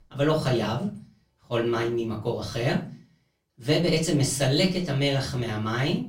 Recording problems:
off-mic speech; far
room echo; very slight; dies away in 0.3 s

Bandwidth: 16 kHz